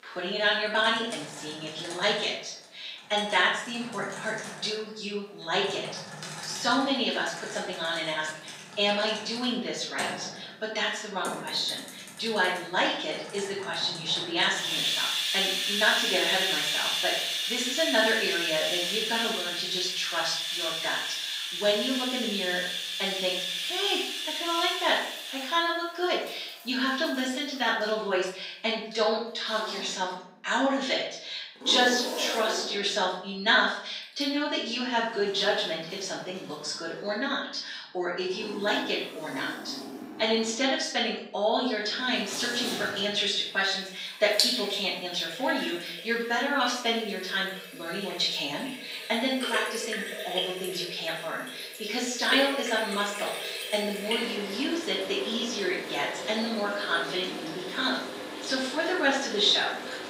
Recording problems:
off-mic speech; far
room echo; noticeable; dies away in 0.6 s
thin; somewhat; fading below 400 Hz
household noises; loud; throughout; 4 dB below the speech

